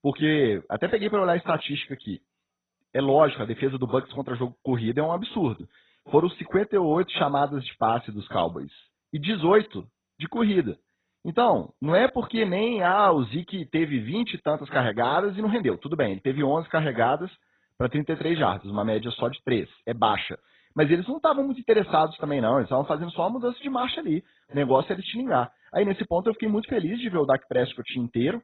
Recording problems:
garbled, watery; badly; nothing above 4 kHz

